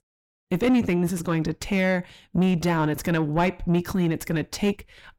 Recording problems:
distortion; slight; 9 dB below the speech

